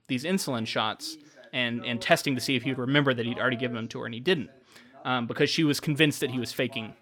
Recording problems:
voice in the background; faint; throughout; 20 dB below the speech

